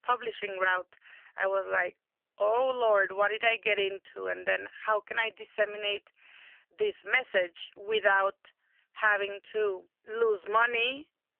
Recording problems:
phone-call audio; poor line; nothing above 3 kHz
thin; very; fading below 400 Hz

